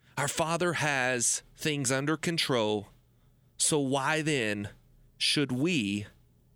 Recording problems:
none

